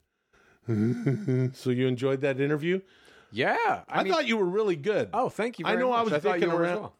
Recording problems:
none

